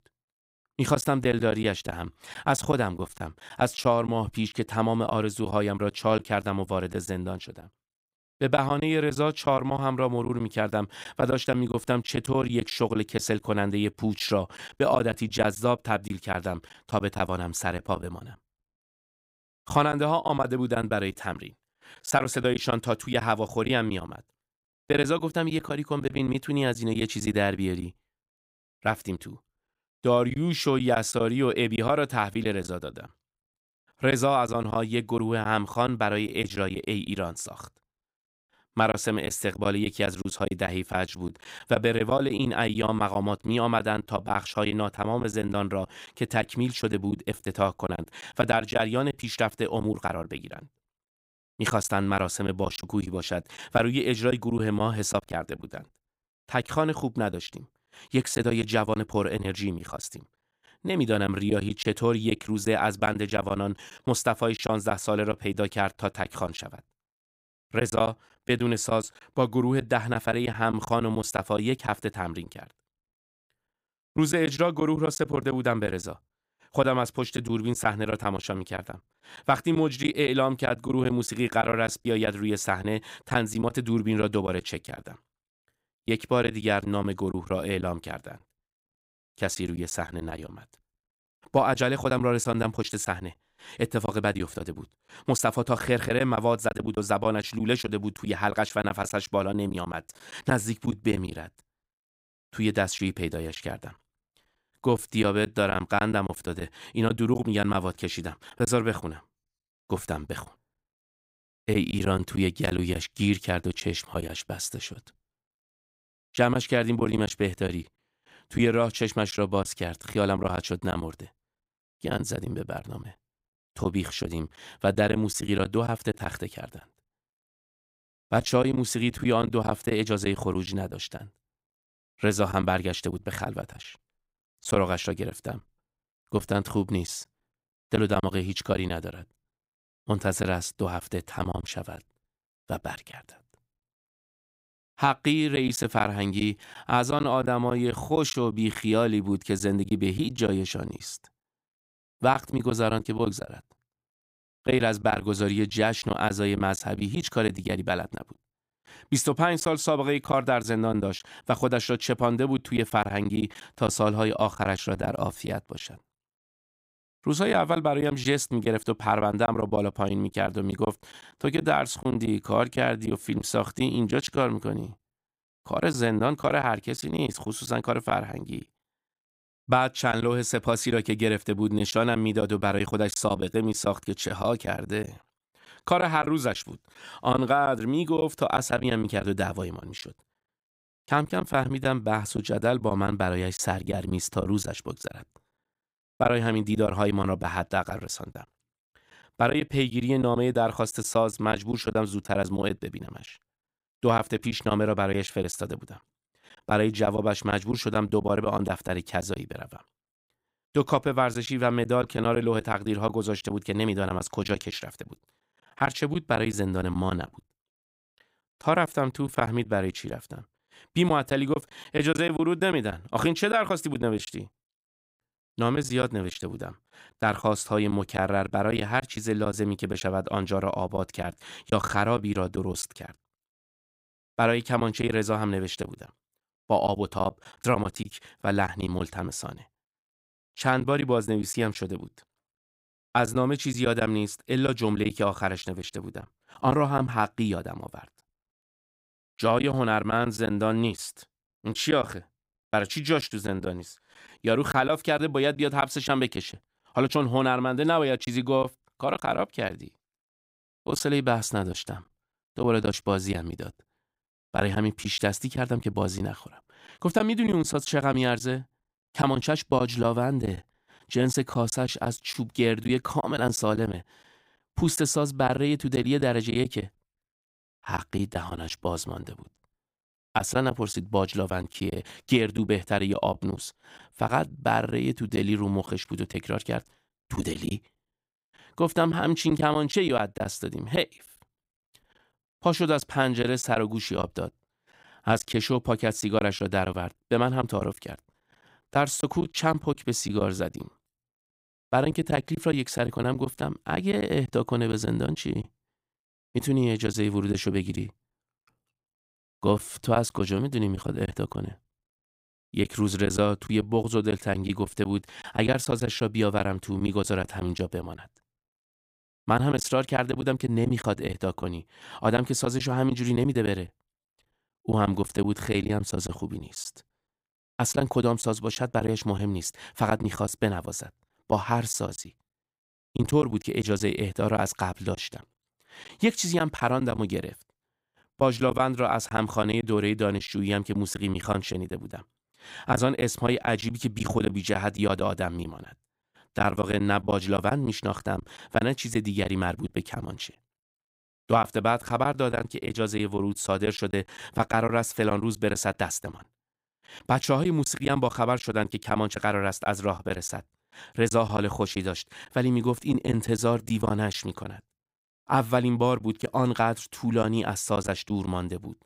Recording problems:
choppy; very; 6% of the speech affected

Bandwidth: 15.5 kHz